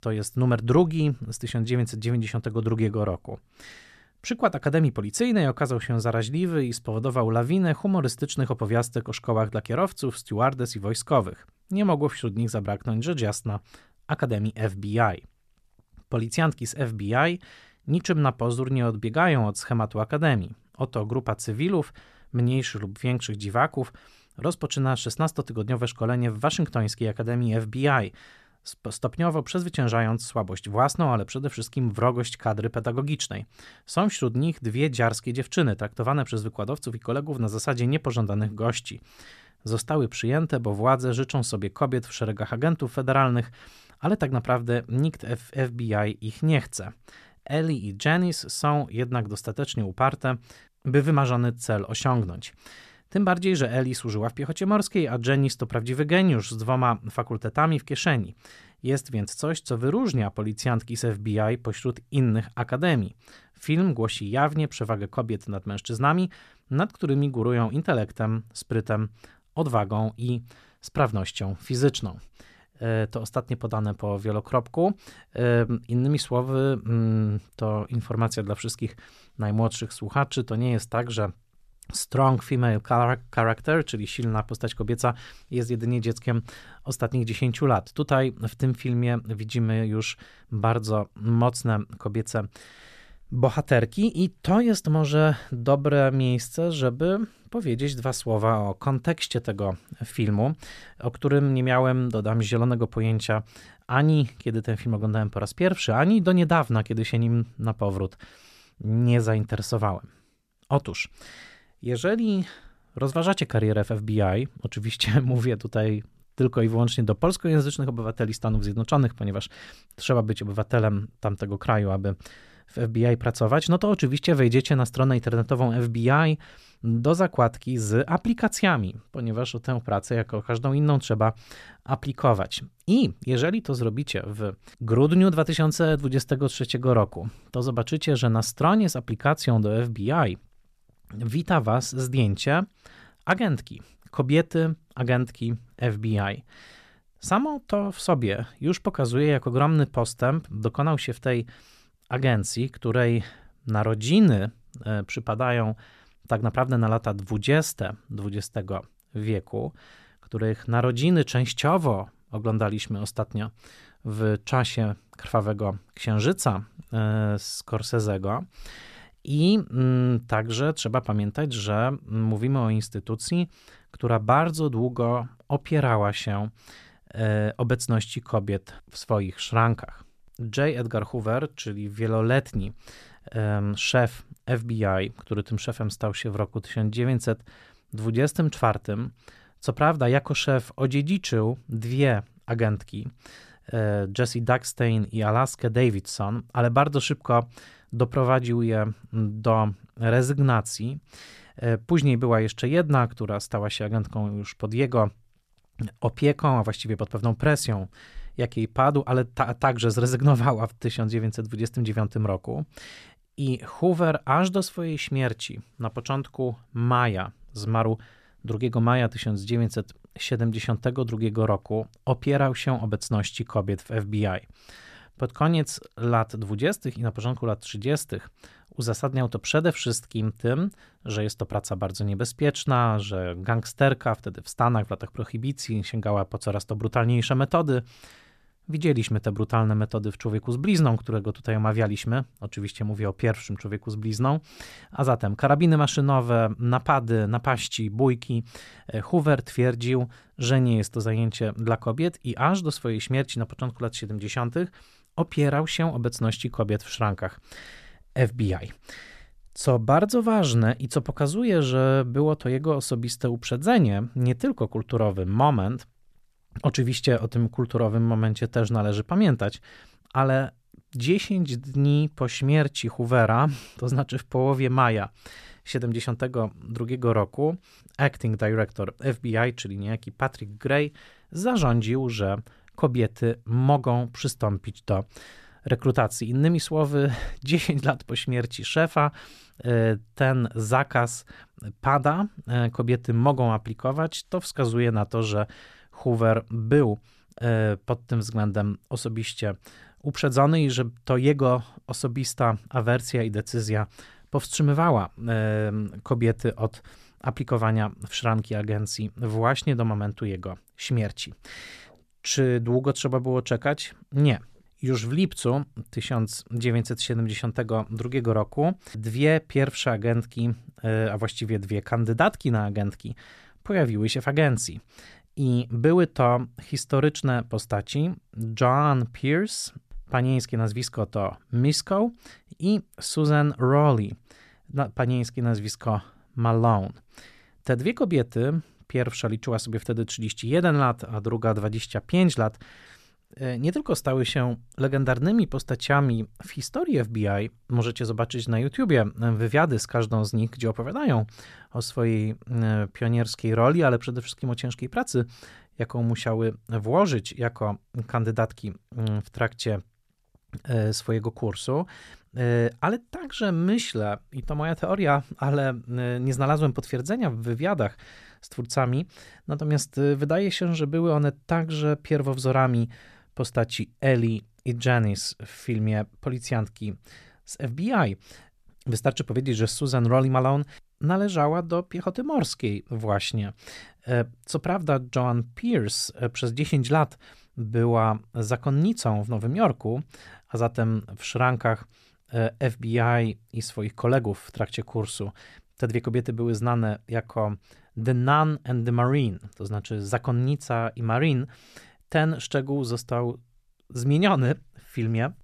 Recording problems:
none

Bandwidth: 14 kHz